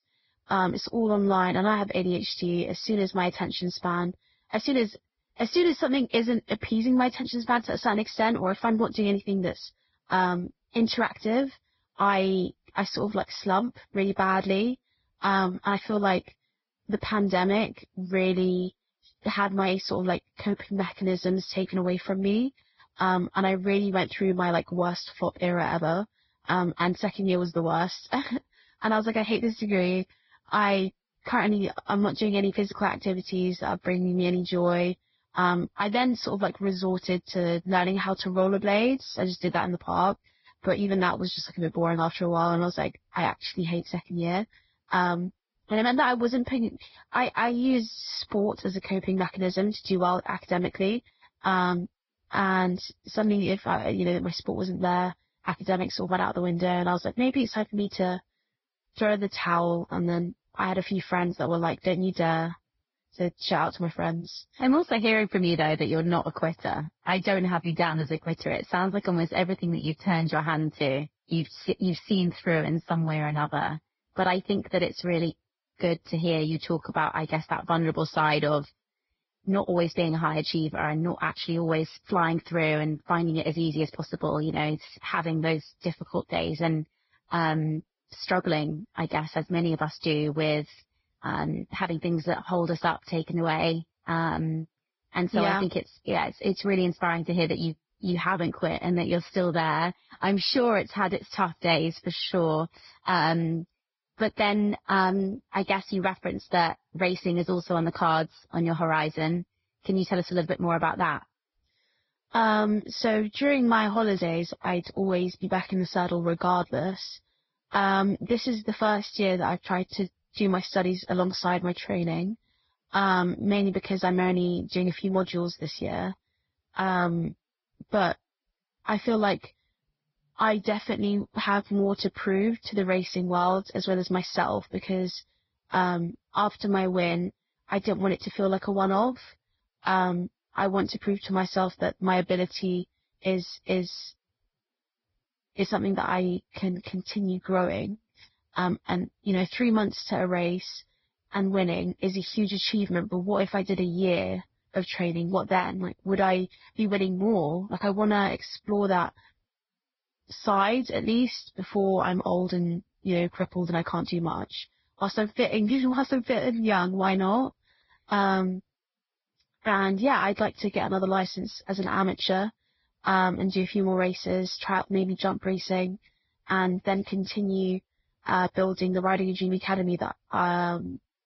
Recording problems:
garbled, watery; badly; nothing above 5.5 kHz
high frequencies cut off; slight

